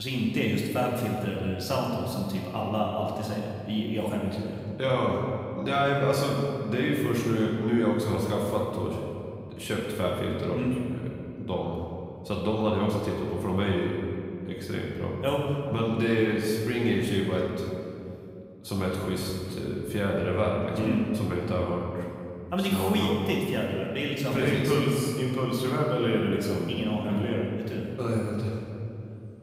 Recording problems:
off-mic speech; far
room echo; noticeable; dies away in 2.3 s
abrupt cut into speech; at the start

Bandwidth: 15.5 kHz